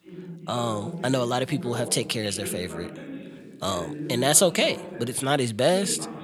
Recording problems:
voice in the background; noticeable; throughout; 15 dB below the speech

